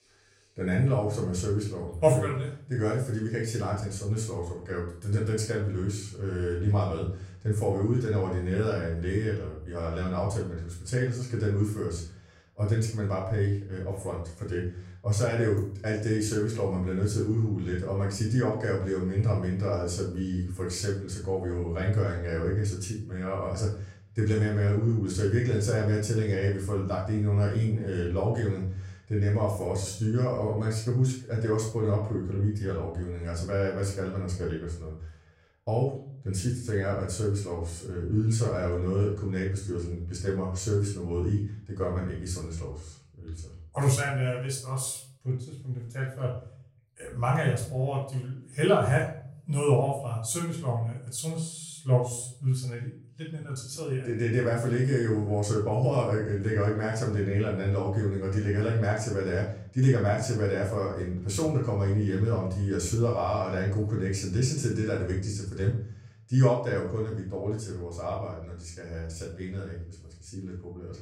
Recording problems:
off-mic speech; far
room echo; slight; dies away in 0.5 s

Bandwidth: 16 kHz